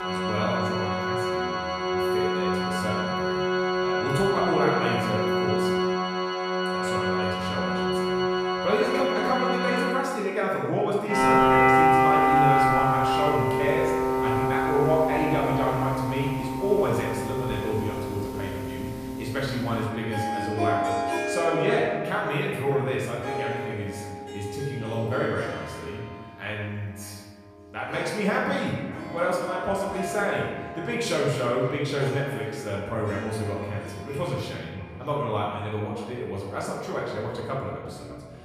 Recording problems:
off-mic speech; far
room echo; noticeable; dies away in 1.2 s
echo of what is said; faint; from 16 s on; 600 ms later, 20 dB below the speech
background music; very loud; throughout; 2 dB above the speech

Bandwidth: 14.5 kHz